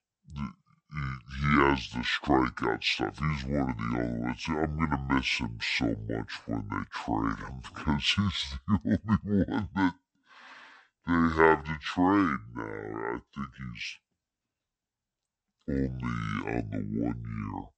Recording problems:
wrong speed and pitch; too slow and too low; 0.6 times normal speed

